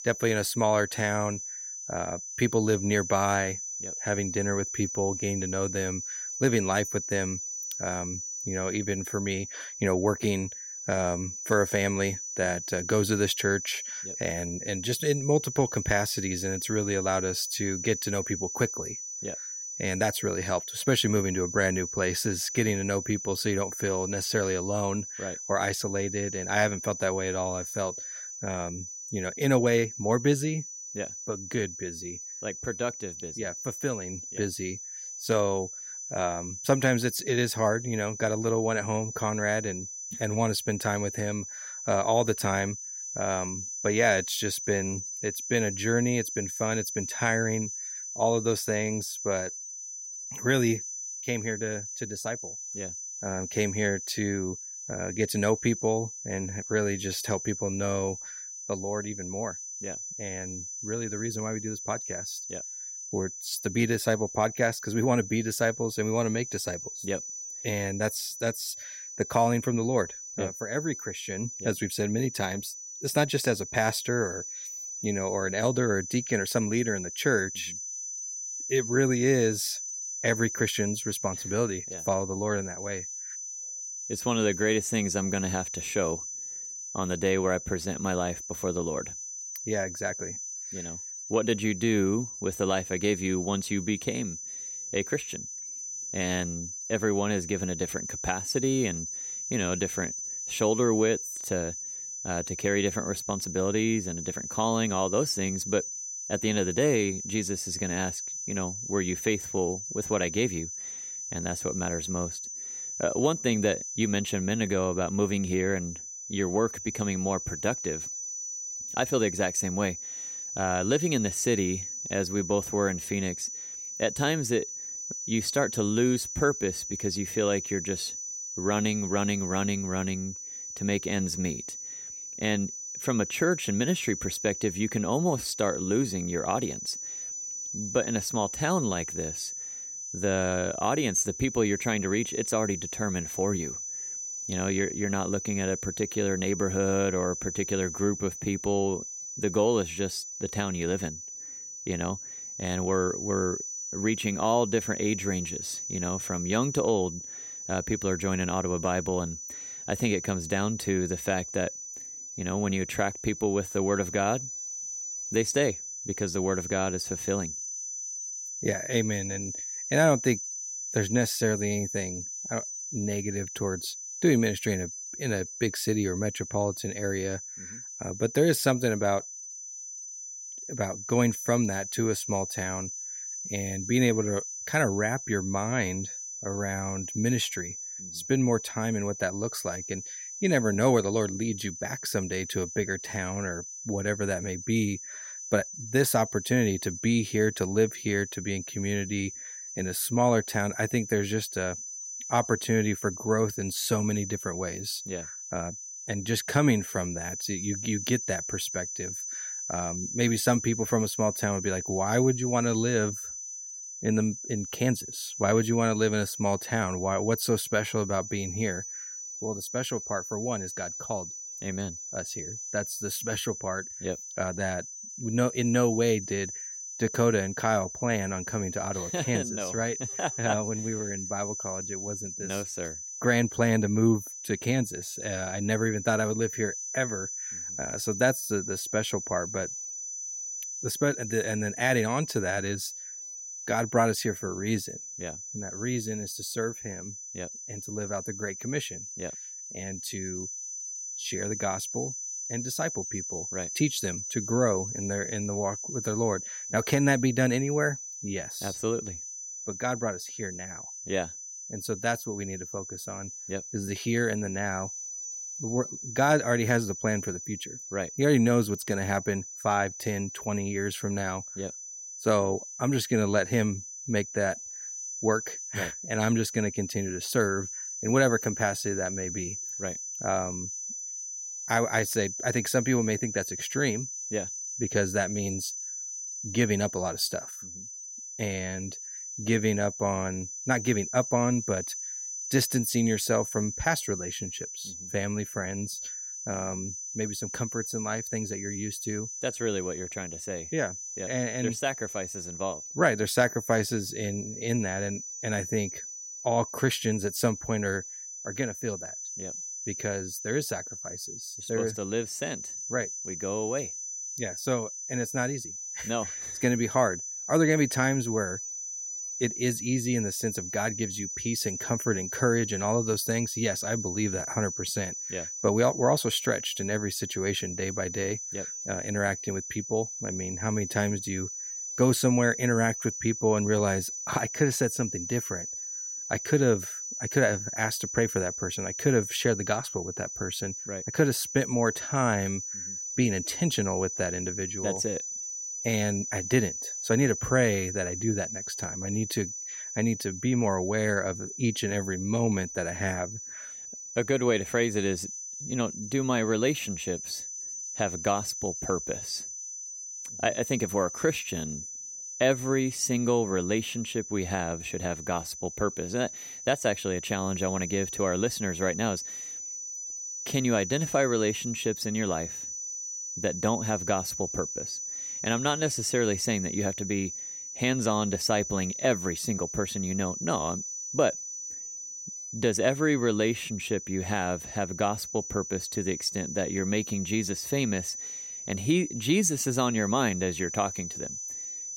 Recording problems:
high-pitched whine; loud; throughout; 6 kHz, 6 dB below the speech

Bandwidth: 16 kHz